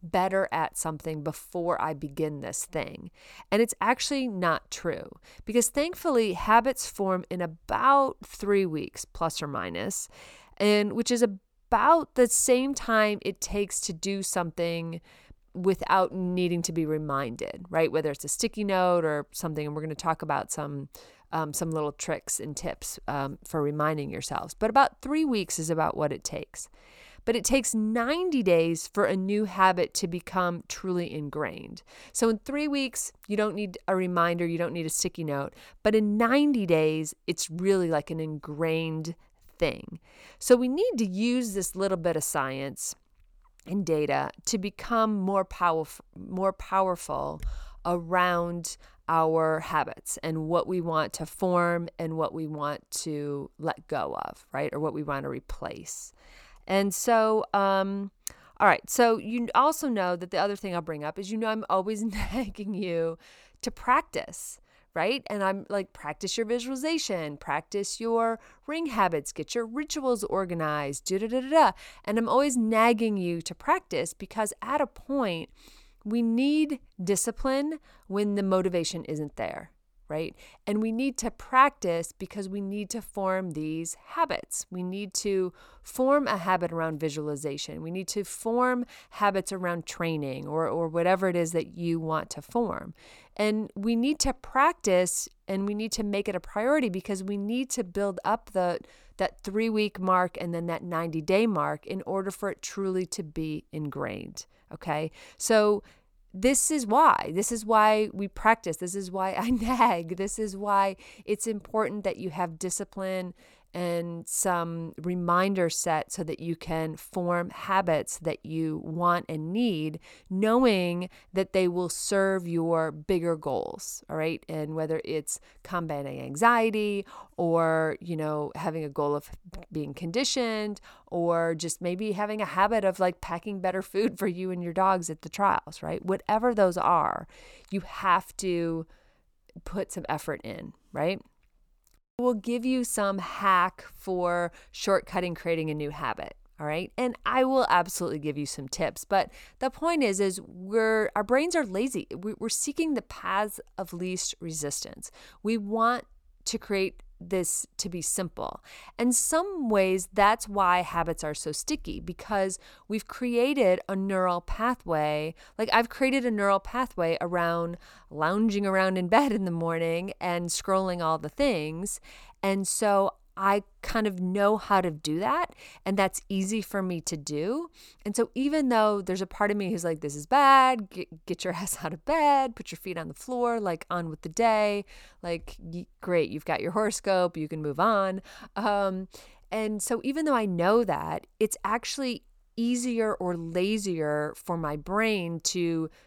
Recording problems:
none

